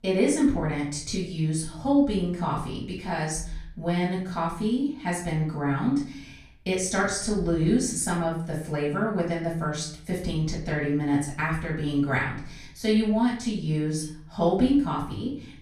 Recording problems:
off-mic speech; far
room echo; noticeable; dies away in 0.5 s

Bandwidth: 15 kHz